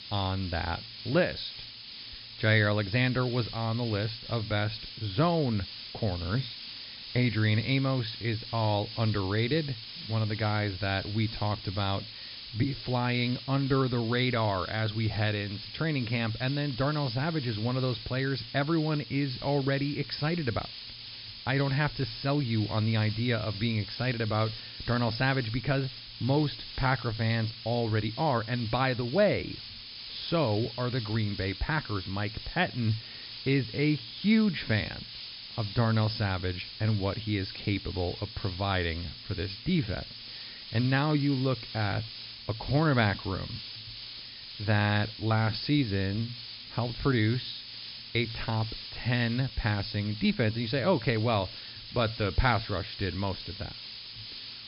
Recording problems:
high frequencies cut off; noticeable; nothing above 5.5 kHz
hiss; noticeable; throughout; 10 dB below the speech

